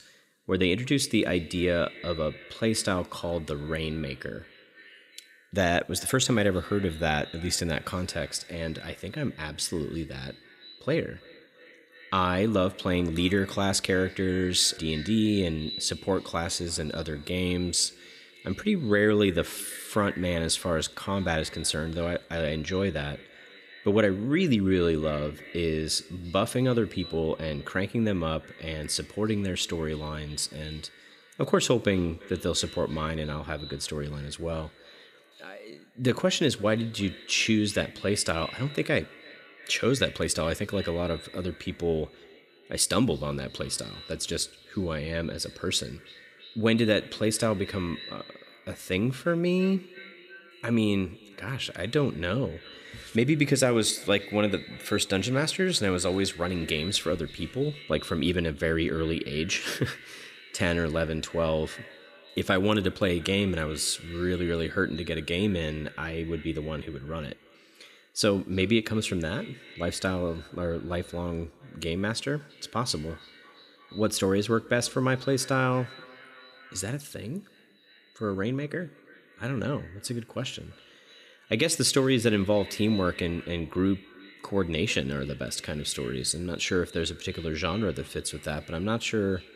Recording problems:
echo of what is said; faint; throughout; 330 ms later, 20 dB below the speech

